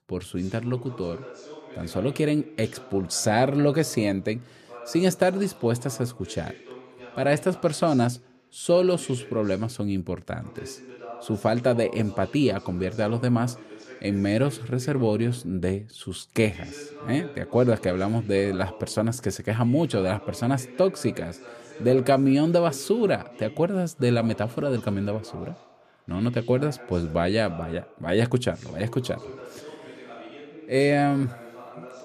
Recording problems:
voice in the background; noticeable; throughout; 20 dB below the speech

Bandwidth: 14.5 kHz